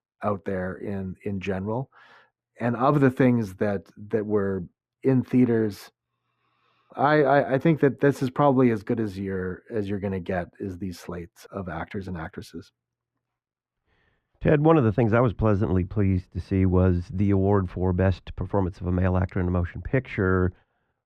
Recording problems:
muffled; very; fading above 3 kHz

